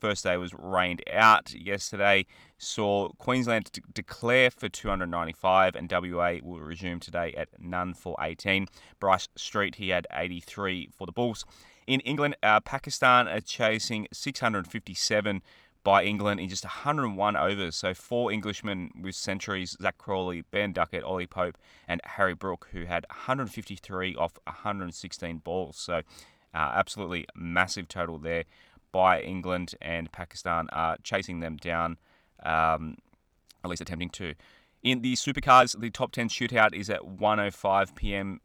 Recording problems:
uneven, jittery; strongly; from 1 to 36 s

